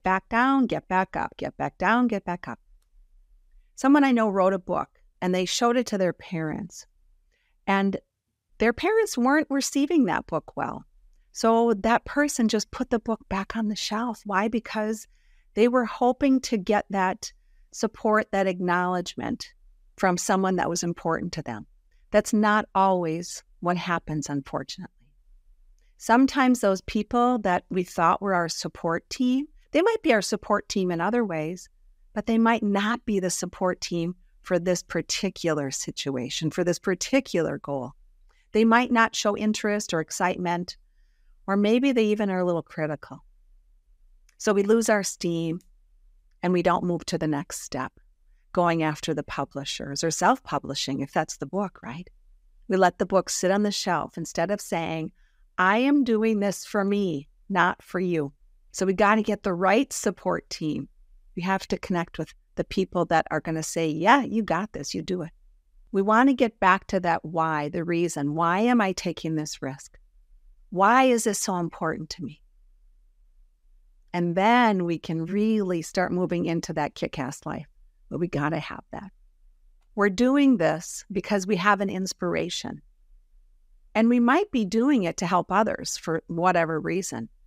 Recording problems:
none

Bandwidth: 15.5 kHz